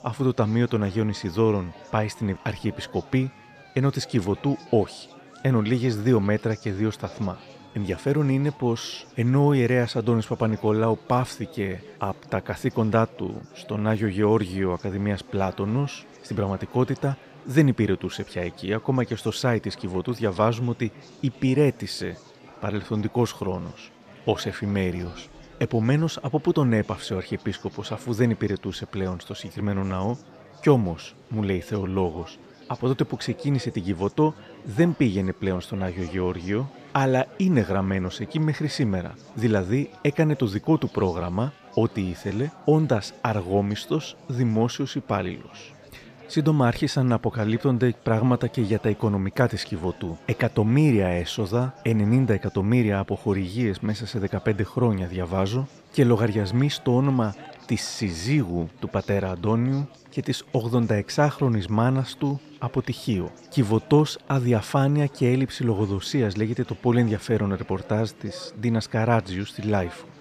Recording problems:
murmuring crowd; faint; throughout; 20 dB below the speech

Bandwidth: 14.5 kHz